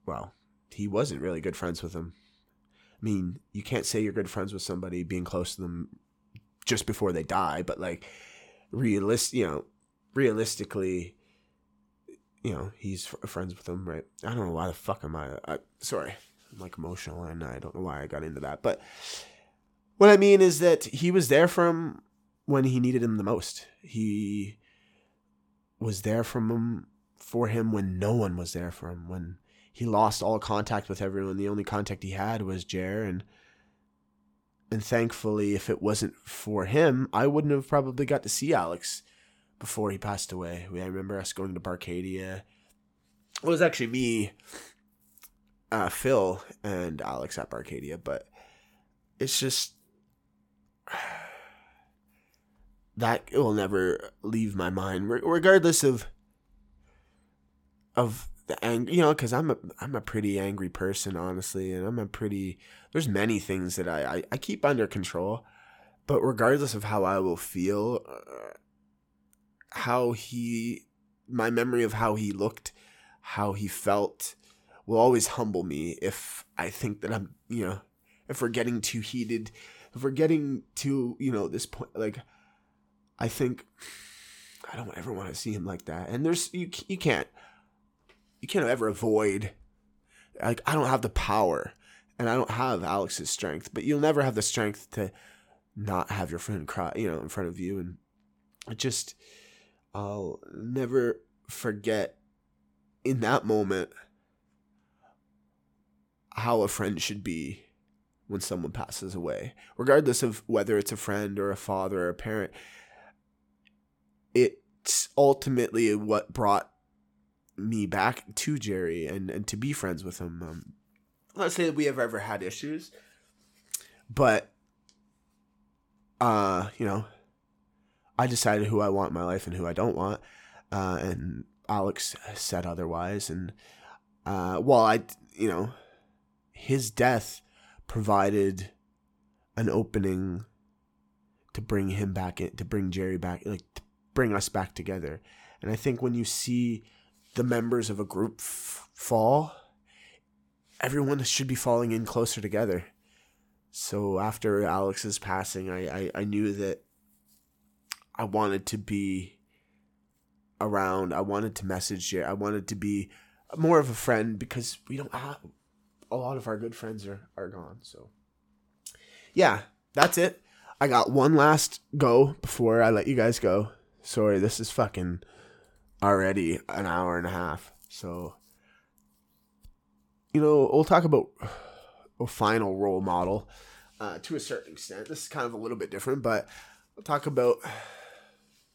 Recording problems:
uneven, jittery; strongly; from 7 s to 1:56

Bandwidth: 17.5 kHz